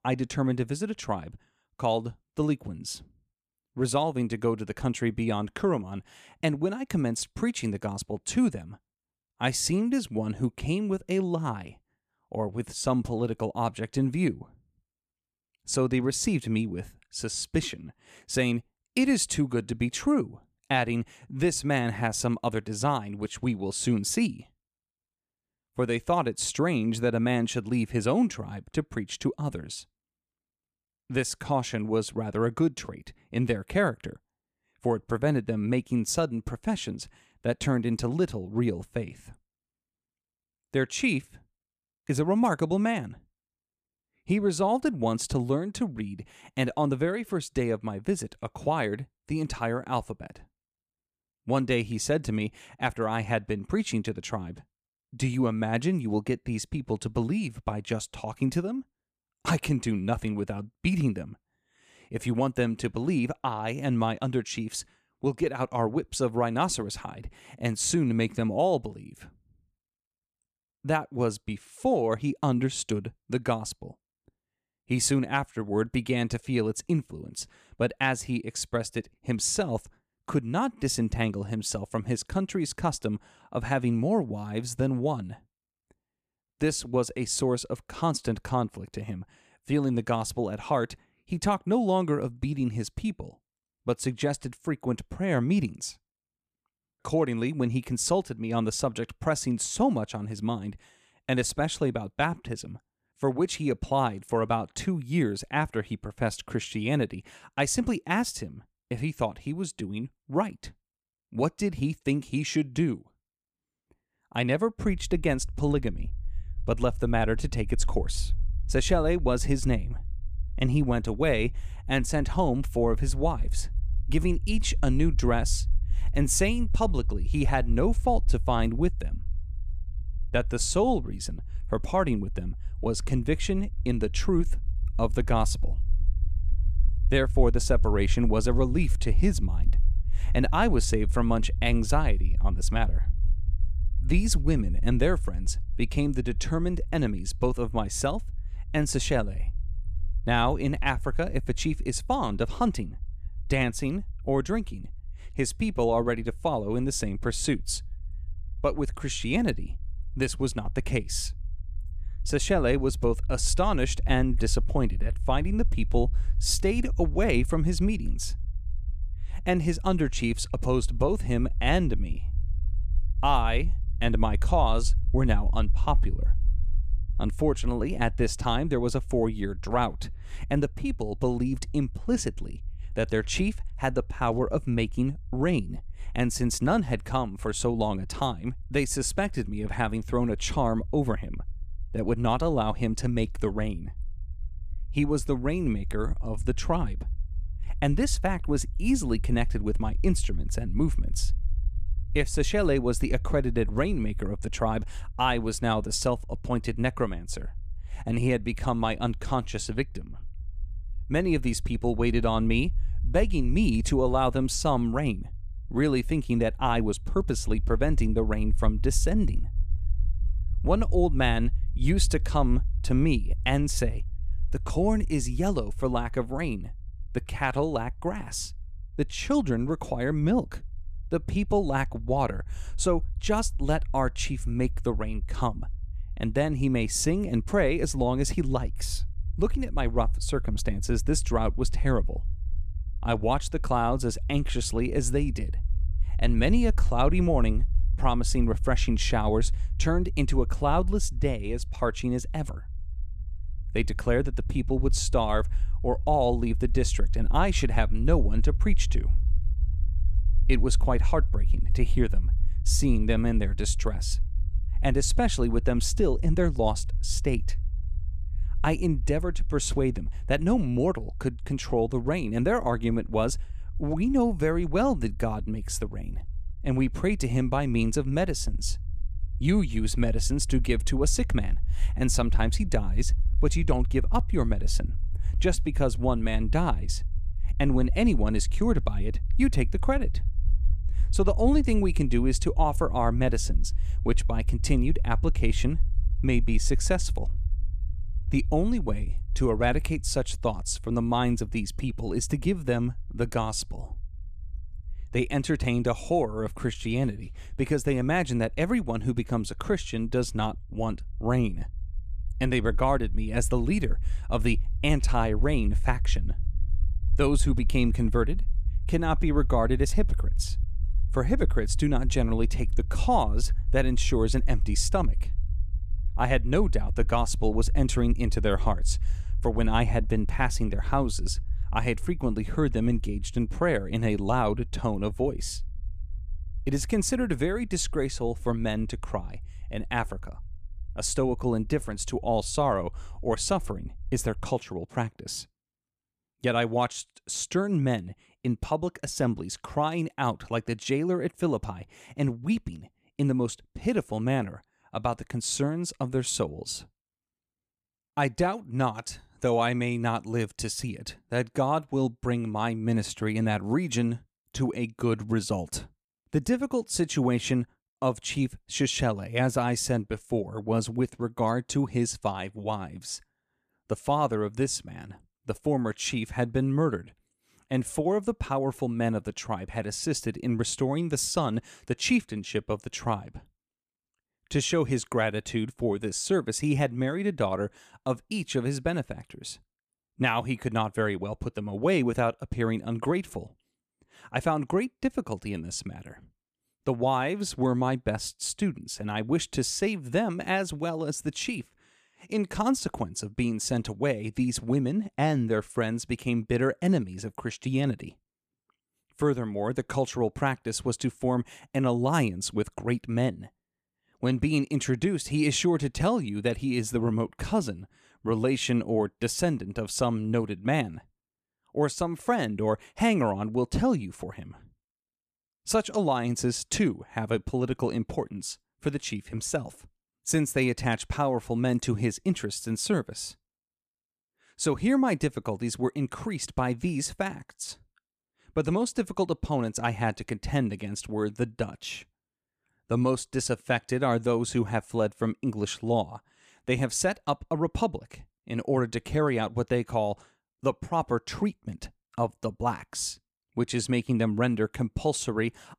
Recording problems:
low rumble; faint; from 1:55 to 5:44; 25 dB below the speech

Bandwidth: 14.5 kHz